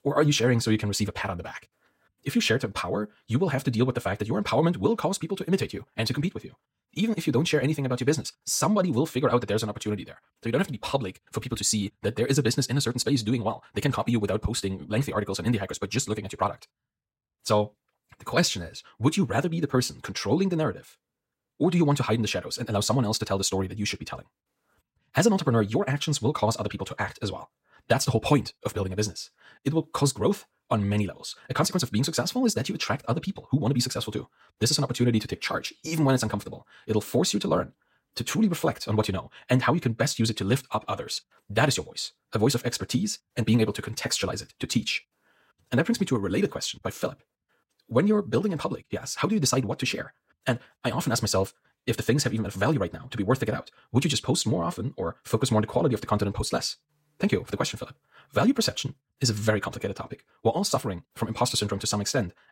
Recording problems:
wrong speed, natural pitch; too fast; 1.7 times normal speed

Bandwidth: 16 kHz